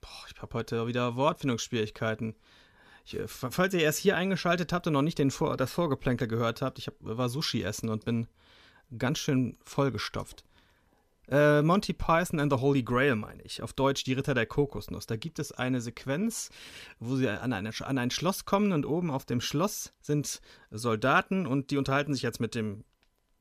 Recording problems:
none

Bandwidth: 14.5 kHz